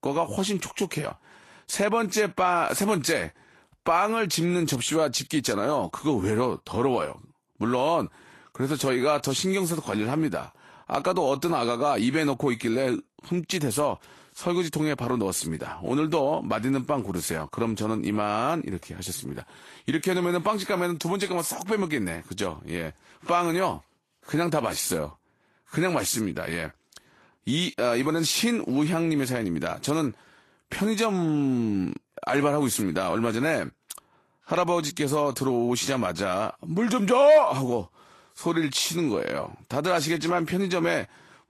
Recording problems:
garbled, watery; slightly; nothing above 12.5 kHz

